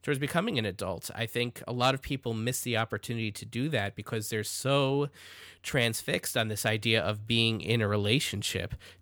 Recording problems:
none

